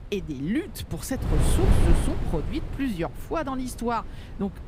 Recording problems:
wind noise on the microphone; heavy; 3 dB below the speech

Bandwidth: 15.5 kHz